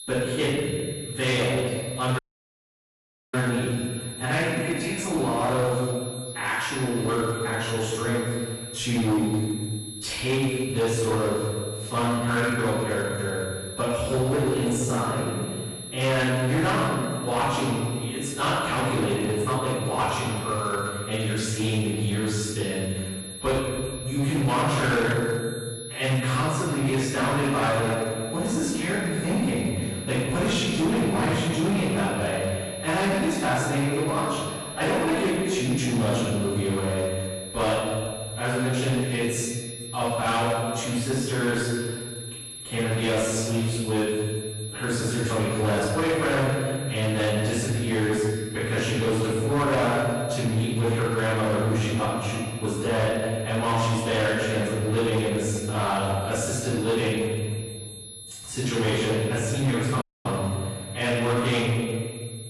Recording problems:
room echo; strong; dies away in 1.6 s
off-mic speech; far
distortion; slight; 14% of the sound clipped
garbled, watery; slightly; nothing above 11.5 kHz
high-pitched whine; noticeable; throughout; 11 kHz, 10 dB below the speech
audio cutting out; at 2 s for 1 s and at 1:00

